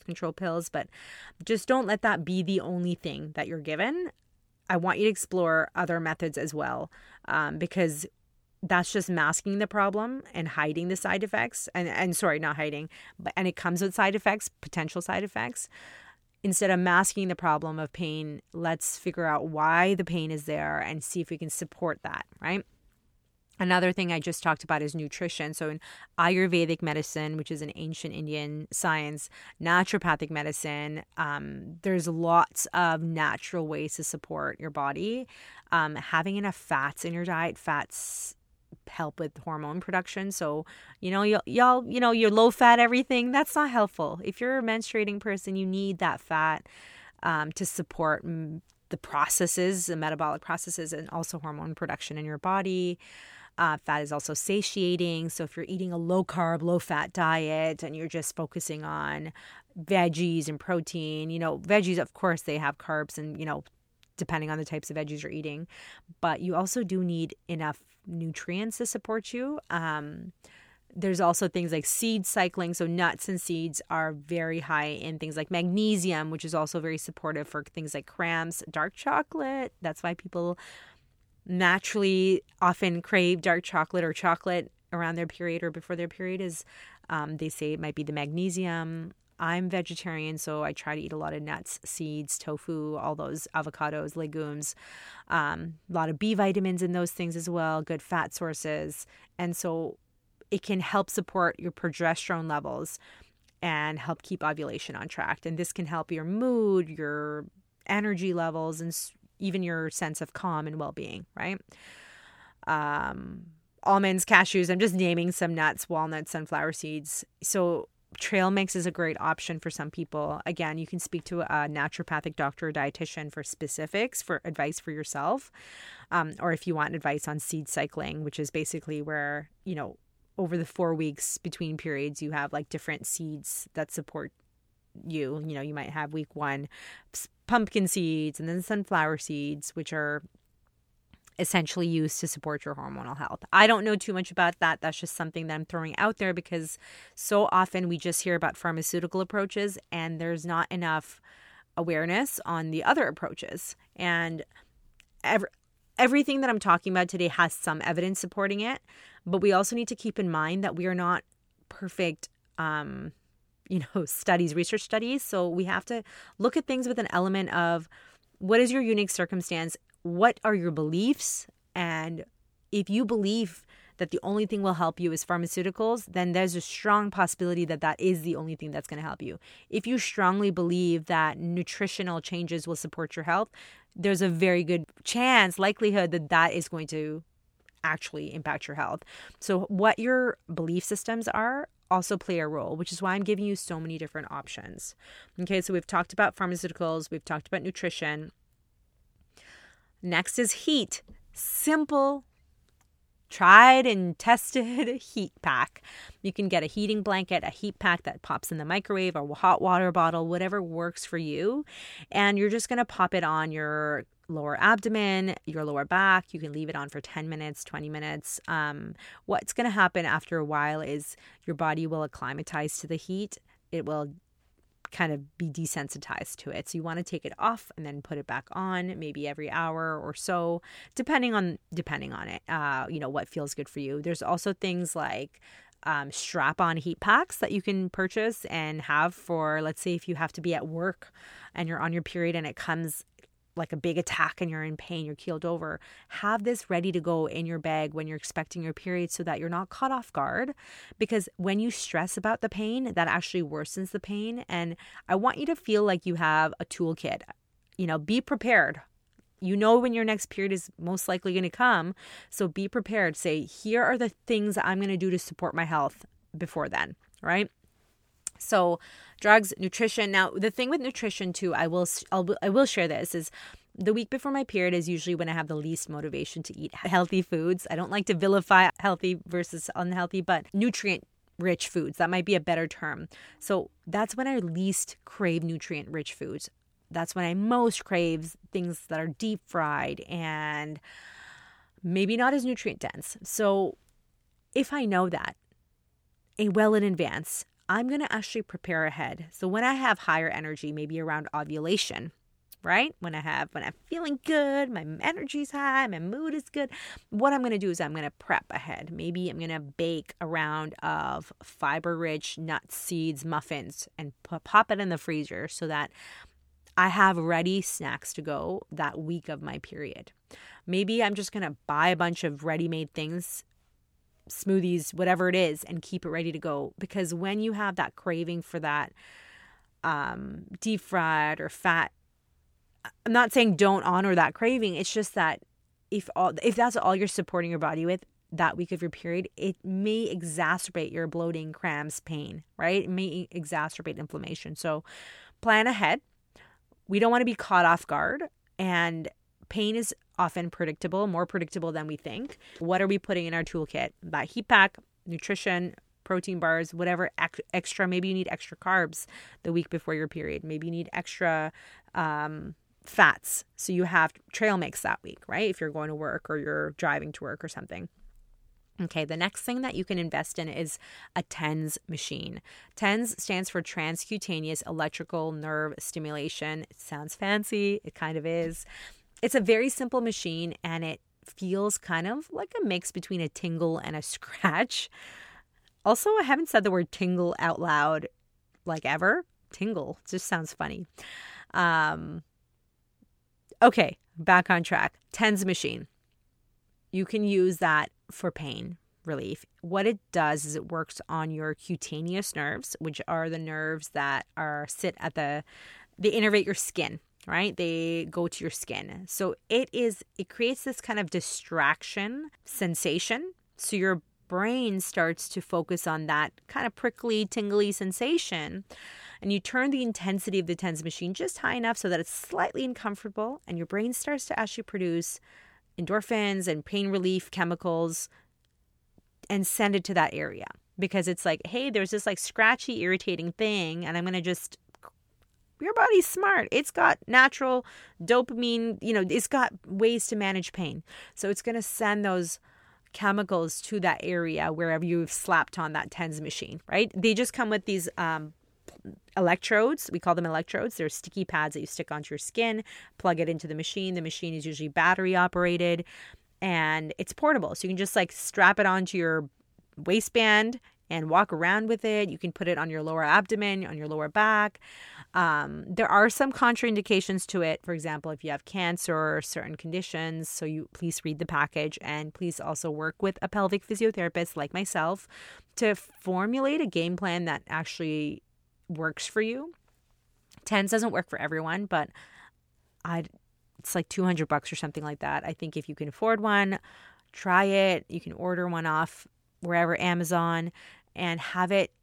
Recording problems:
none

